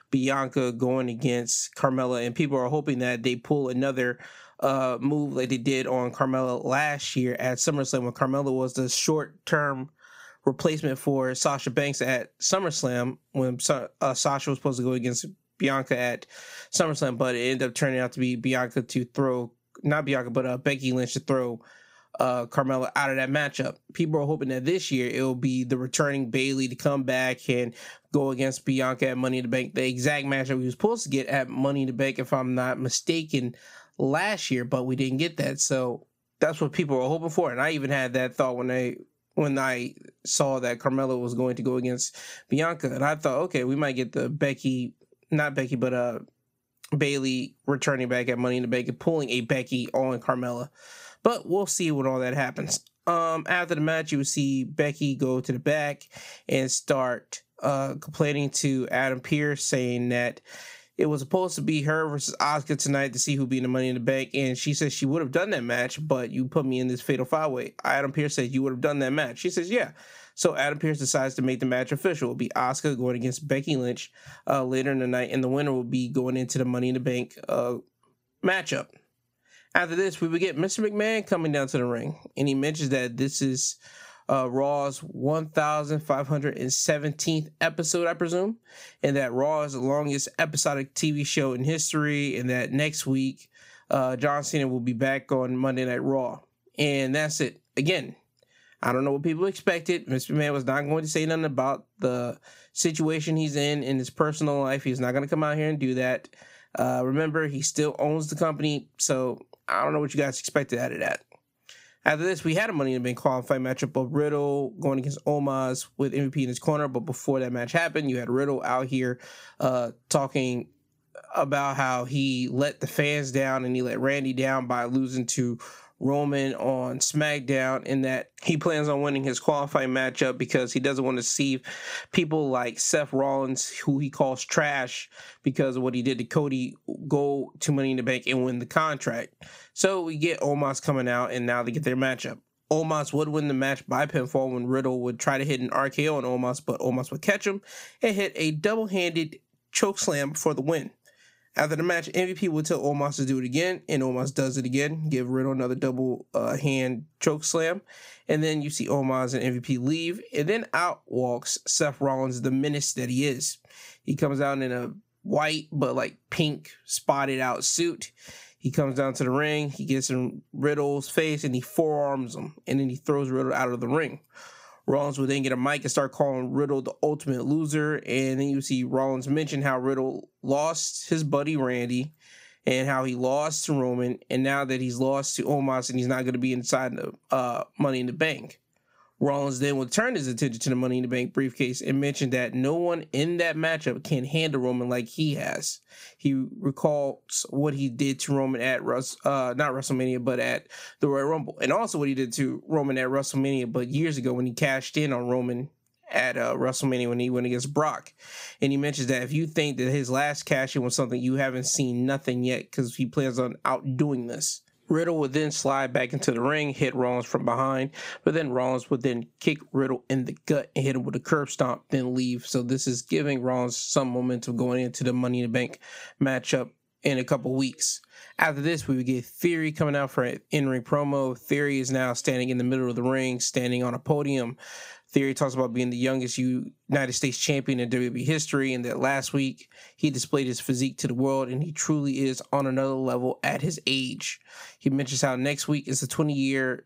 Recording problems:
squashed, flat; somewhat

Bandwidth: 15.5 kHz